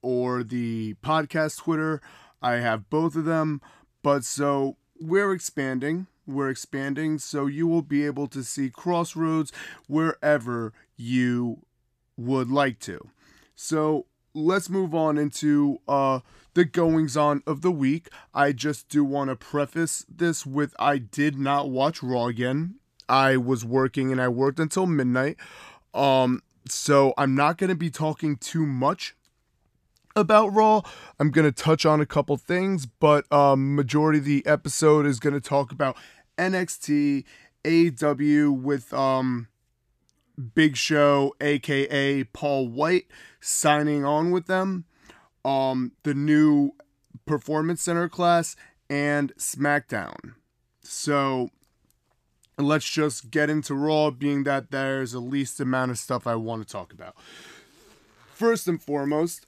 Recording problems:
none

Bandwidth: 14.5 kHz